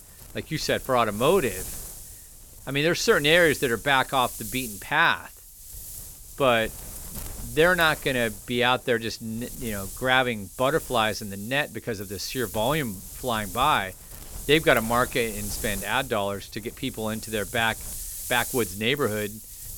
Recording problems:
wind noise on the microphone; occasional gusts; 20 dB below the speech

